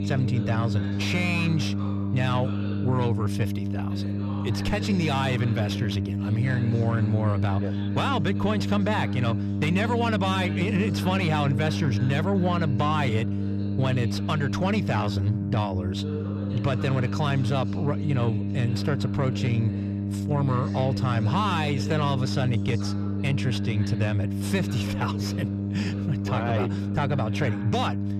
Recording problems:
distortion; slight; 10 dB below the speech
electrical hum; loud; throughout; 50 Hz, 7 dB below the speech
voice in the background; noticeable; throughout; 15 dB below the speech

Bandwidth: 14.5 kHz